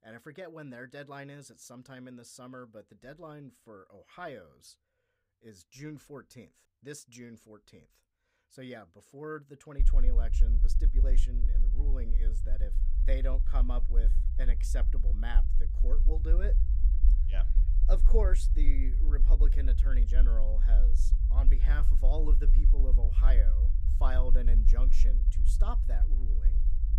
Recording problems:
low rumble; loud; from 10 s on; 8 dB below the speech

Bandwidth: 15.5 kHz